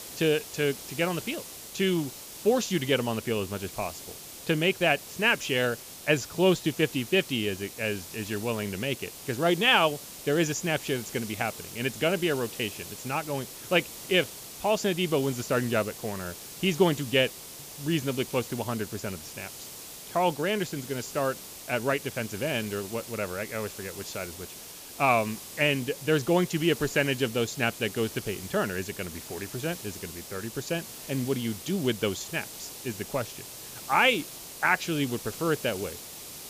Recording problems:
high frequencies cut off; noticeable; nothing above 8 kHz
hiss; noticeable; throughout; 10 dB below the speech

